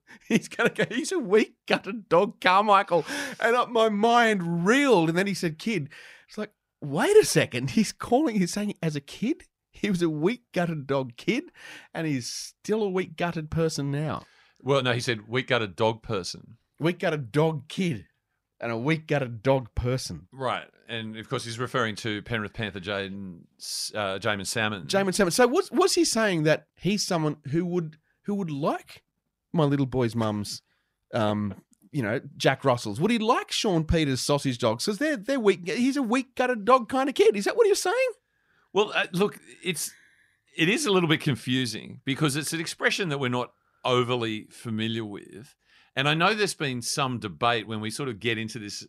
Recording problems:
none

